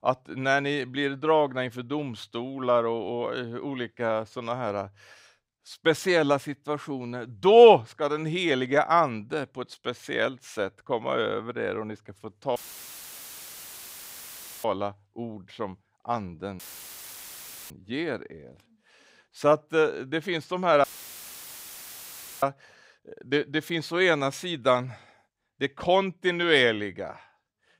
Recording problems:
audio cutting out; filled with static; at 13 s for 2 s, at 17 s for 1 s and at 21 s for 1.5 s

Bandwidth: 15.5 kHz